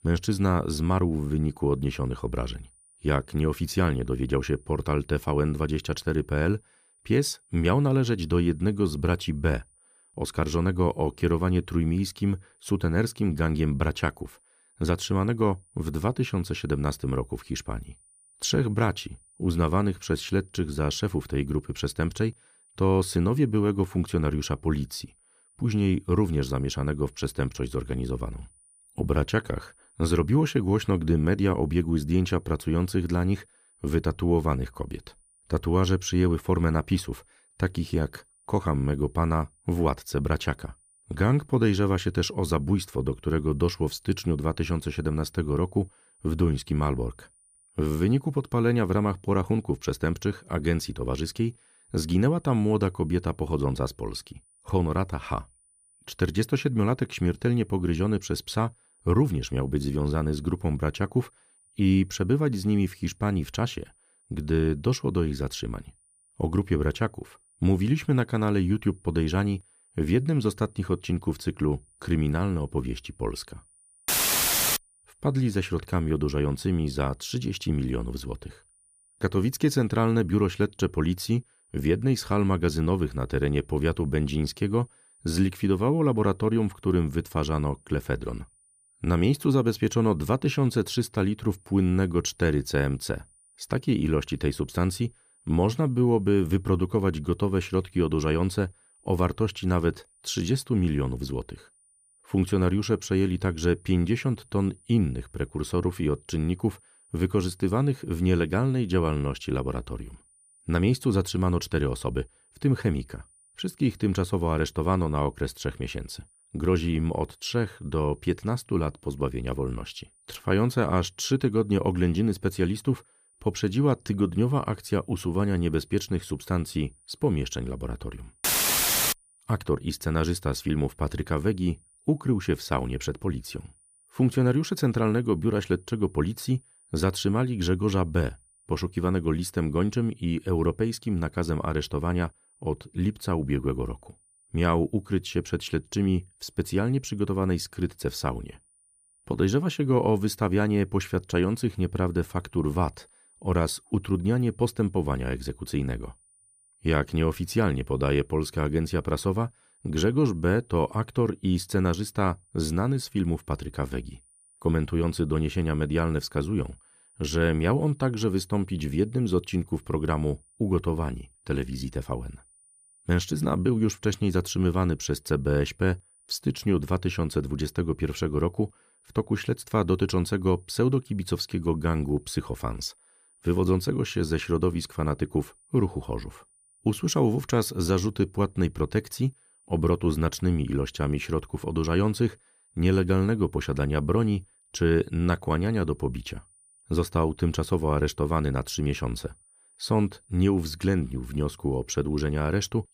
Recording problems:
high-pitched whine; faint; throughout; 9.5 kHz, 30 dB below the speech

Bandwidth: 15 kHz